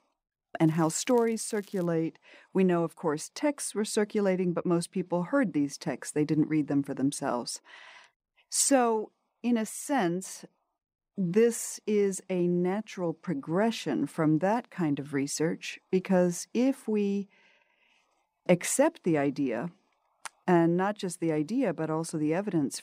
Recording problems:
crackling; faint; from 0.5 to 2 s; 25 dB below the speech

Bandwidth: 15.5 kHz